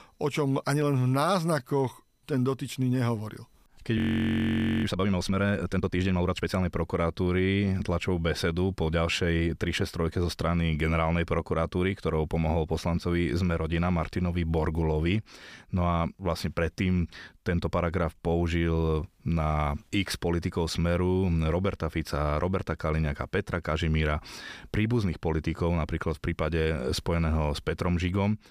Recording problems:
audio freezing; at 4 s for 1 s

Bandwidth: 15 kHz